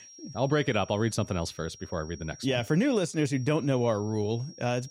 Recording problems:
high-pitched whine; noticeable; throughout; 5.5 kHz, 20 dB below the speech

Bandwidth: 16 kHz